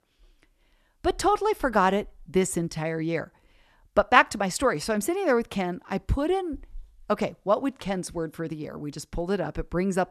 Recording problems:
none

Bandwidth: 13.5 kHz